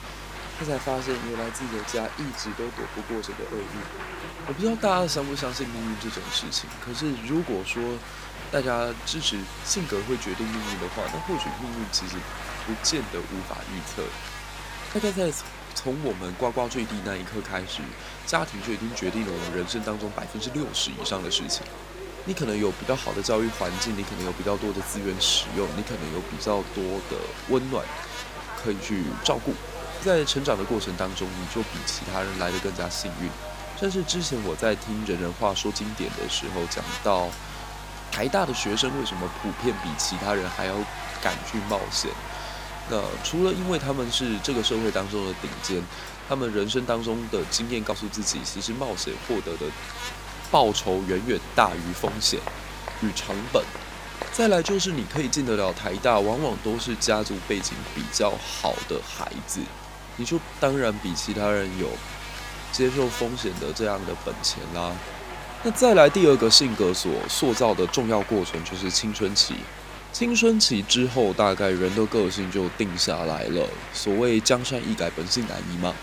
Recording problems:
electrical hum; noticeable; throughout; 50 Hz, 10 dB below the speech
crowd noise; noticeable; throughout; 15 dB below the speech

